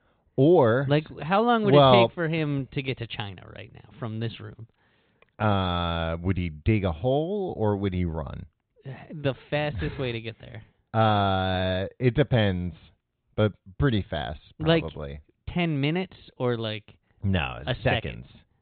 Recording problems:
high frequencies cut off; severe; nothing above 4 kHz

